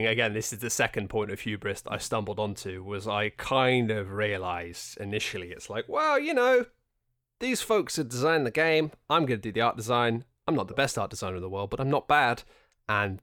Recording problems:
abrupt cut into speech; at the start

